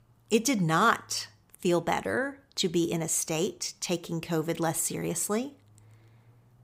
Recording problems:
none

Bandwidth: 15.5 kHz